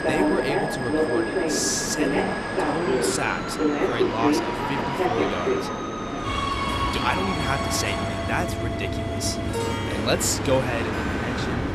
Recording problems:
train or aircraft noise; very loud; throughout; 2 dB above the speech
background music; loud; throughout; 6 dB below the speech

